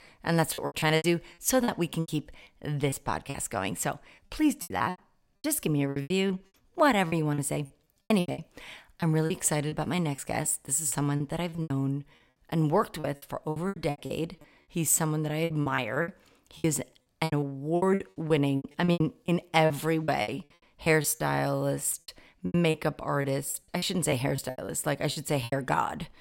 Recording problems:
choppy; very; 16% of the speech affected

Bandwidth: 16 kHz